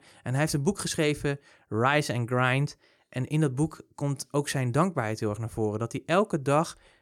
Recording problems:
none

